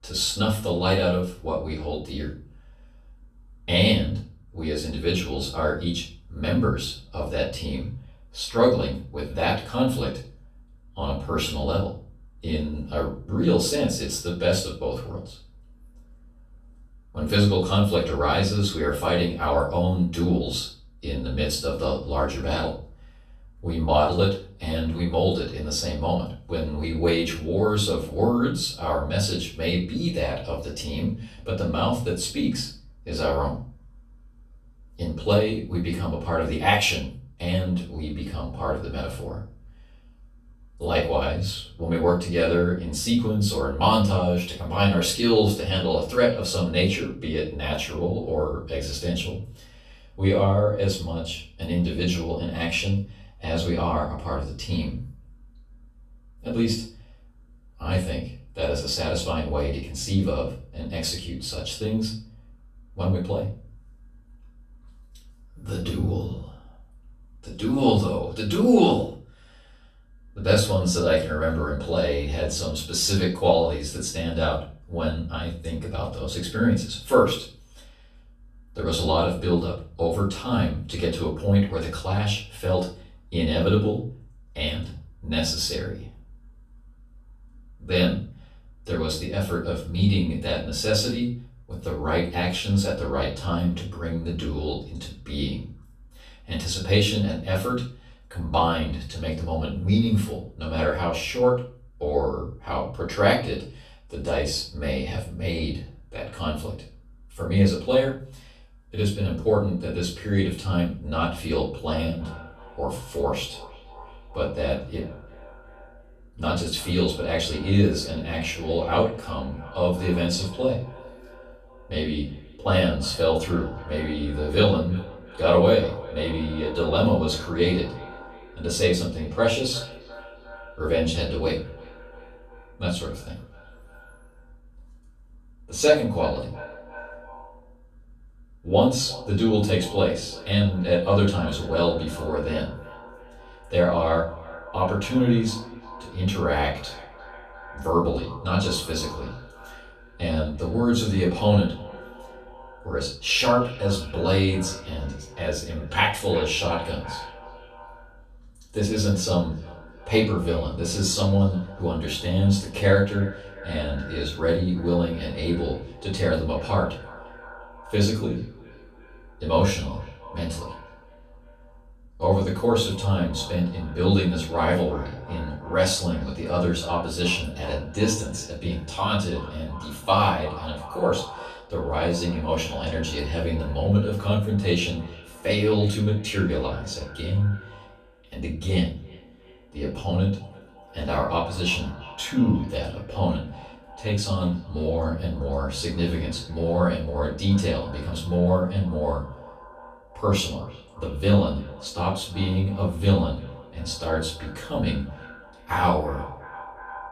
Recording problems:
off-mic speech; far
echo of what is said; faint; from 1:52 on; 350 ms later, 20 dB below the speech
room echo; slight; dies away in 0.4 s

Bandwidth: 13.5 kHz